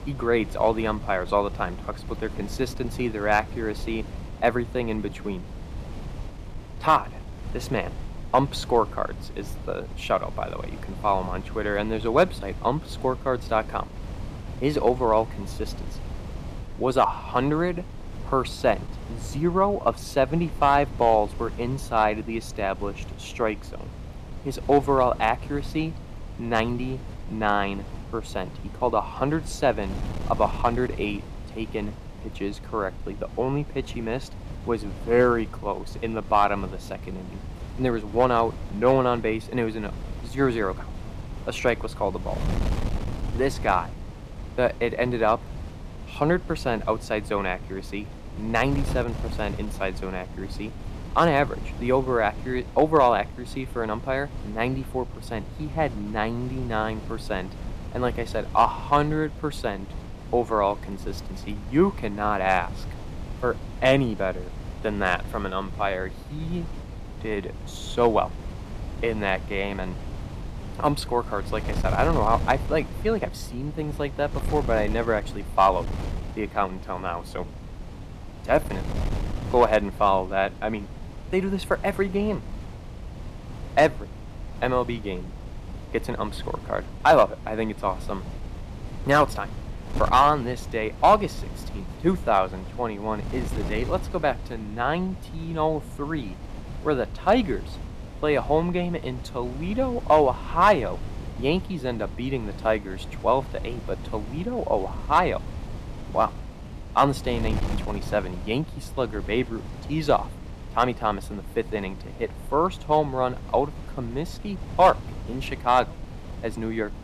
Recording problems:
wind noise on the microphone; occasional gusts; 20 dB below the speech

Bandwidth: 14.5 kHz